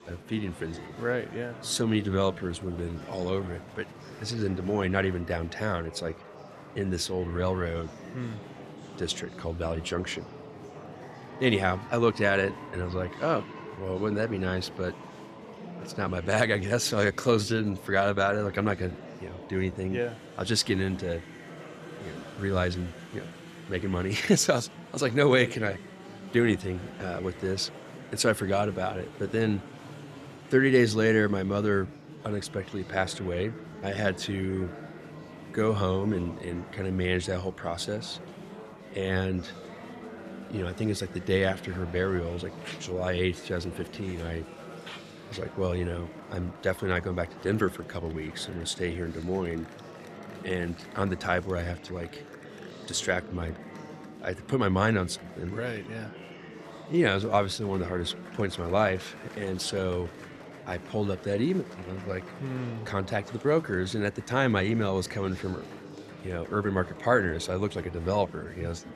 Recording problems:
murmuring crowd; noticeable; throughout; 15 dB below the speech

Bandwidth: 14 kHz